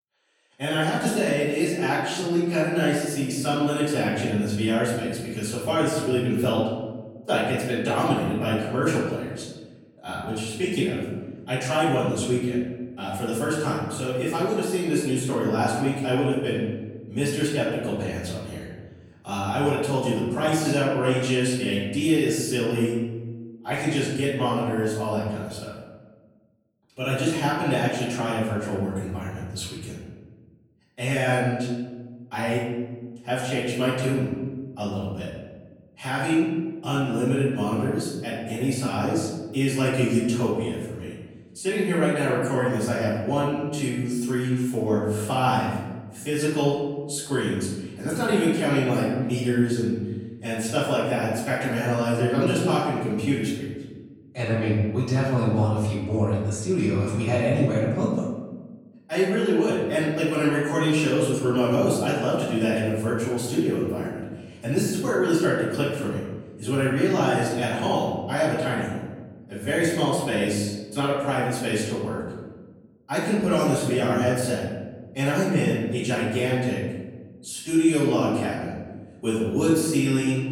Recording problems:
off-mic speech; far
room echo; noticeable; dies away in 1.2 s

